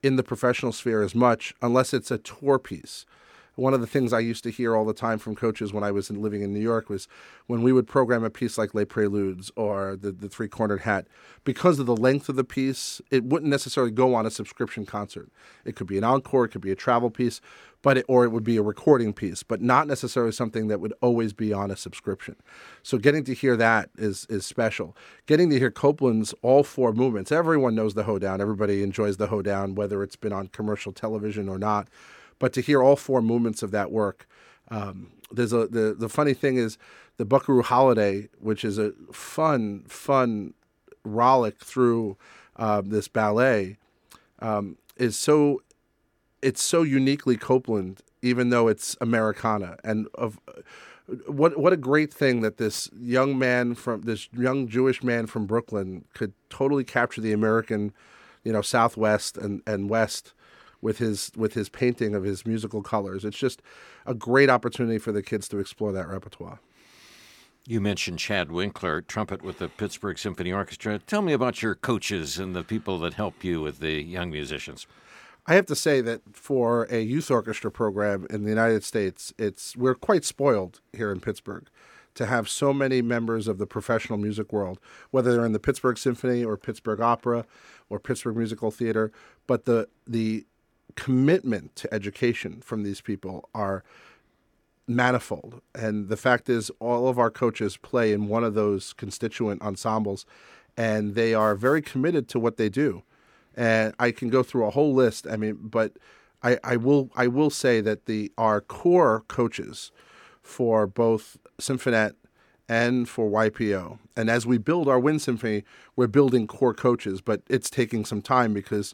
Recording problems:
none

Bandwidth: 18.5 kHz